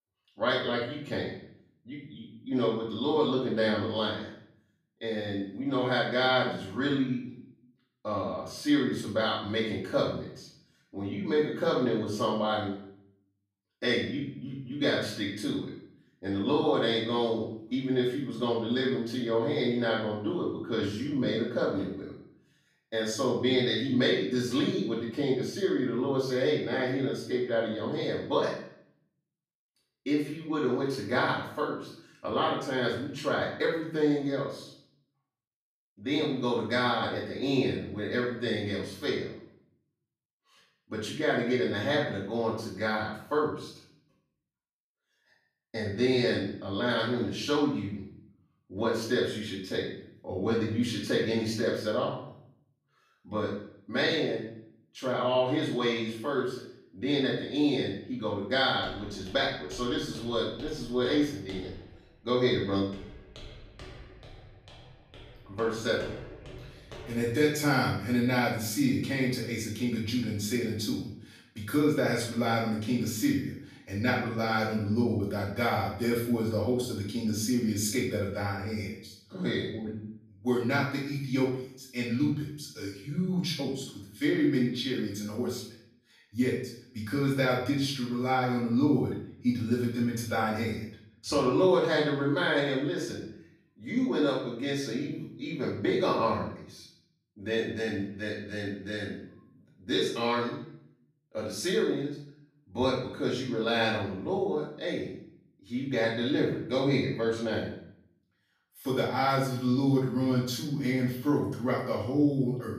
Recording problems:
off-mic speech; far
room echo; noticeable; dies away in 0.6 s
footsteps; faint; from 59 s to 1:07; peak 10 dB below the speech

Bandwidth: 14.5 kHz